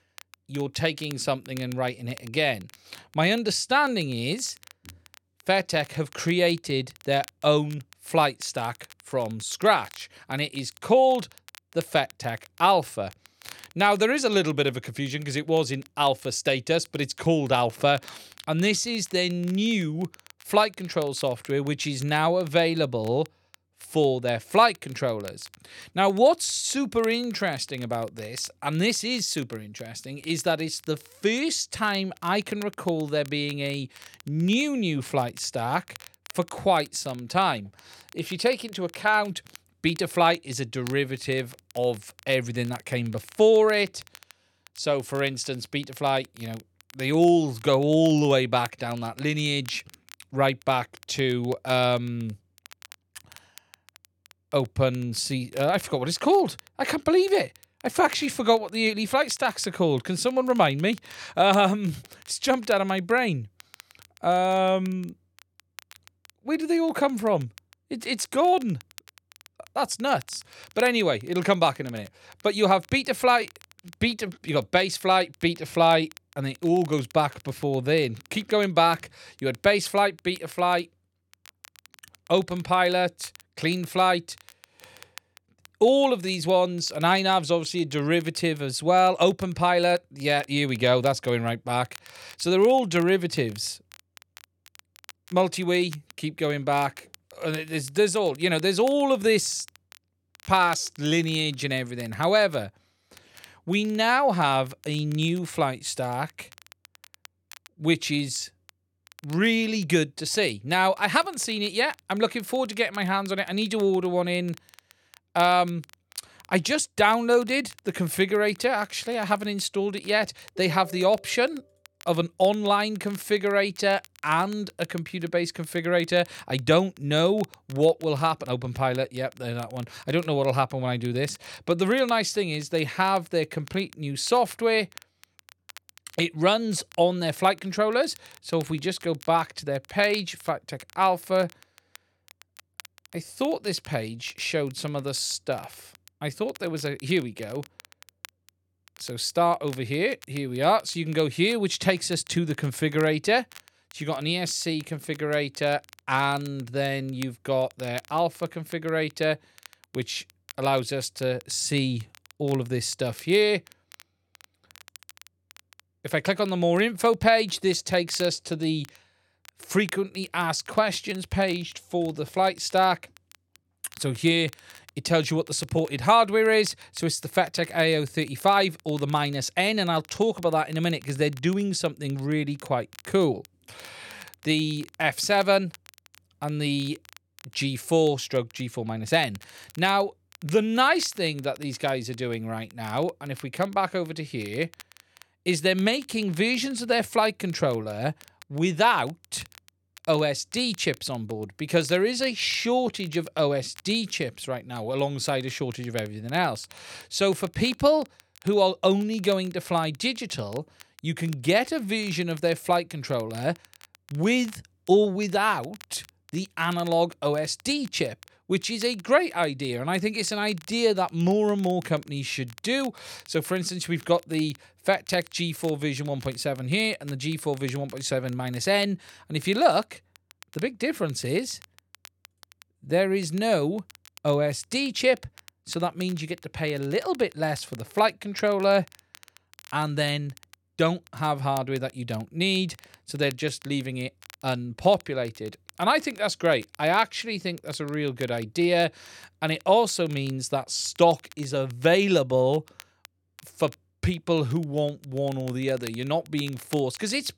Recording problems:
crackle, like an old record; faint; 25 dB below the speech

